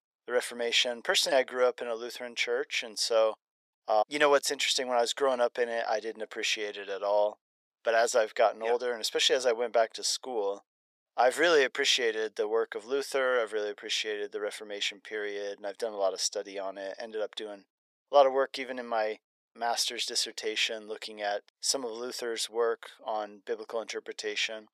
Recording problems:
thin; very; fading below 500 Hz

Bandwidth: 14.5 kHz